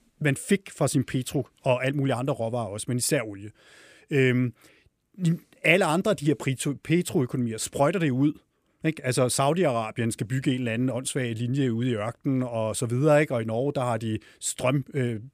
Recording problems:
none

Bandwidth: 15 kHz